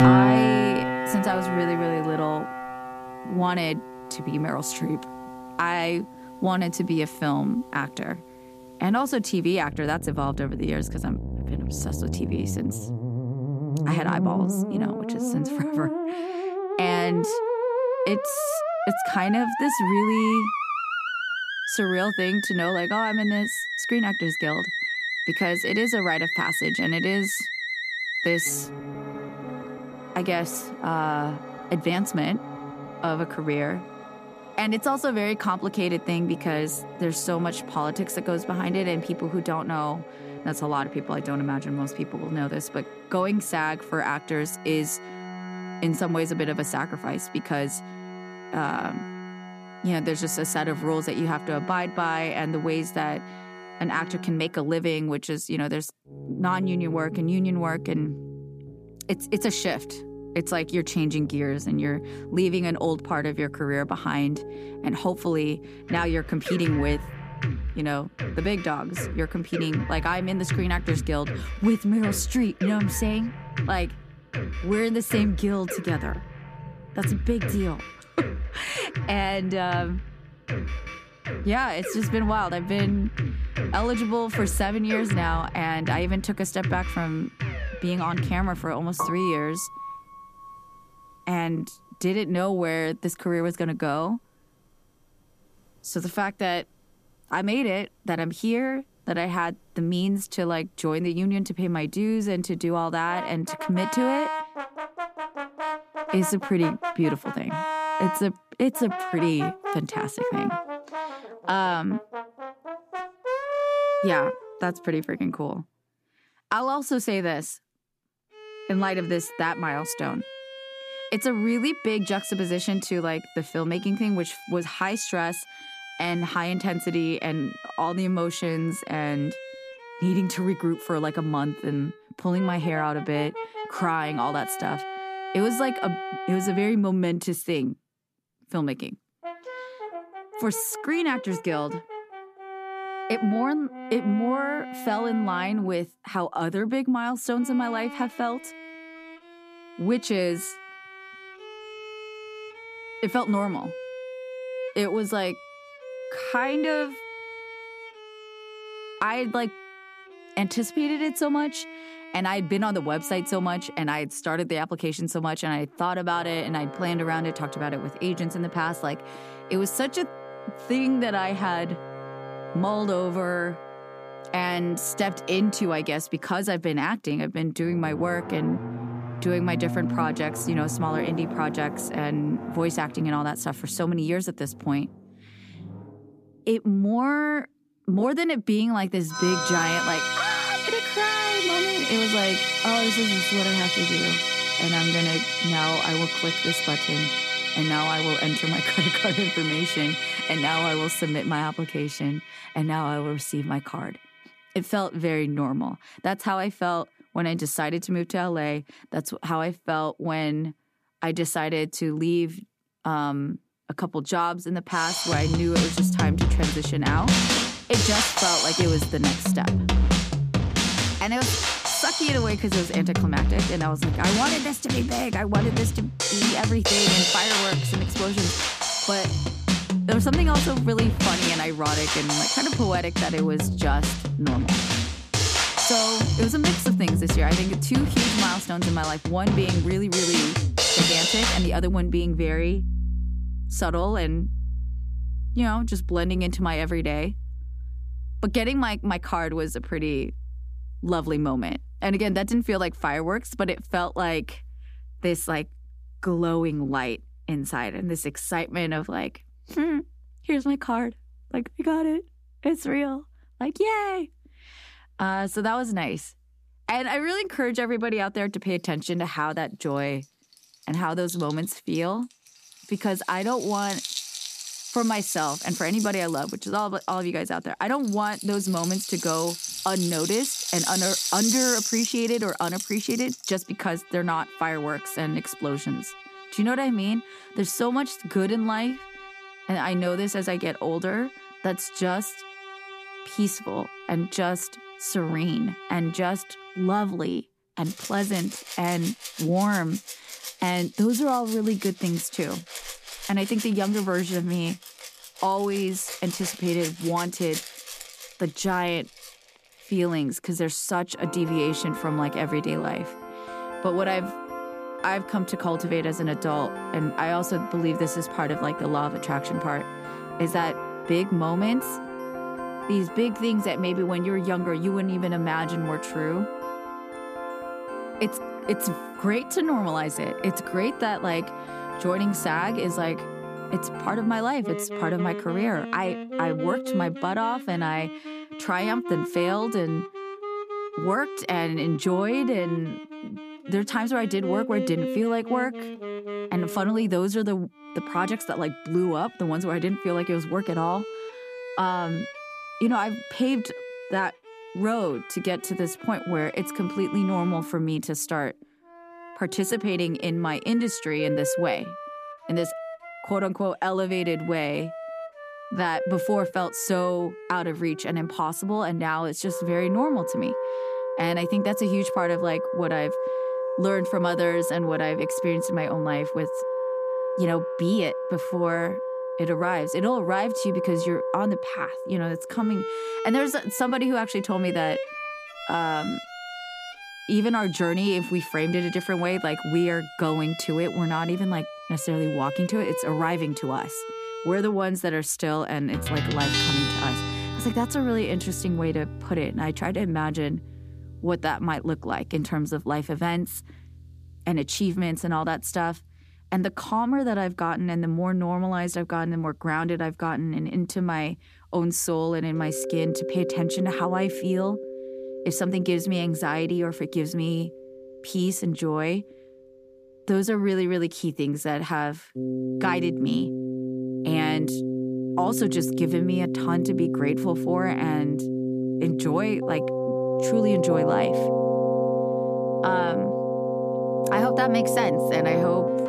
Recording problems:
background music; loud; throughout; 2 dB below the speech

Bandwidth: 14.5 kHz